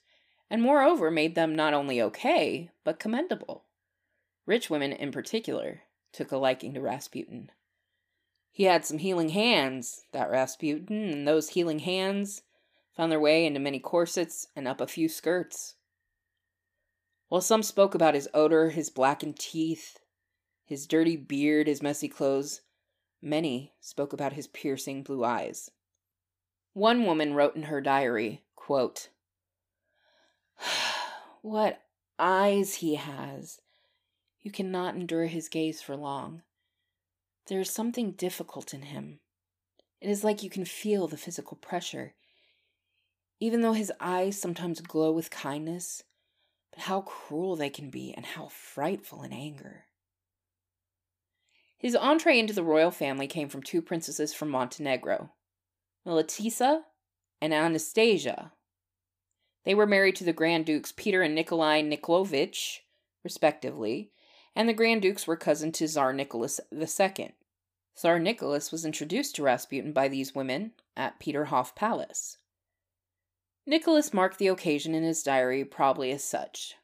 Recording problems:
none

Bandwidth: 15 kHz